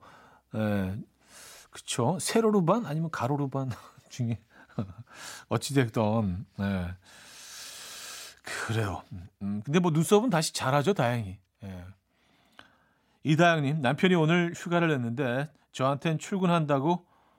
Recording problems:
none

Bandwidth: 16 kHz